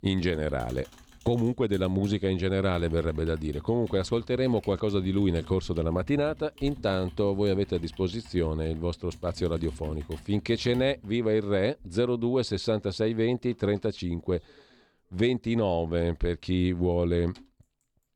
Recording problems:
household noises; noticeable; throughout; 20 dB below the speech

